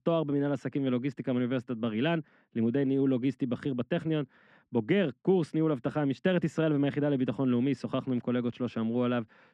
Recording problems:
muffled; very; fading above 2.5 kHz

